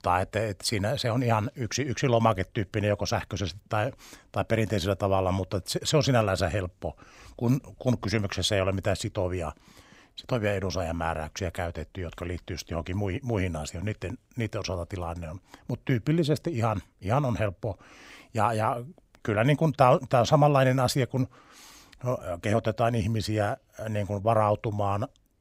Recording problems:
none

